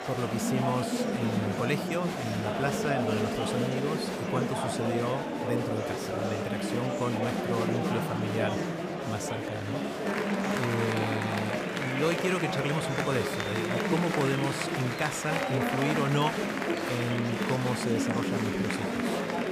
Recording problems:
murmuring crowd; very loud; throughout; 2 dB above the speech

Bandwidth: 15 kHz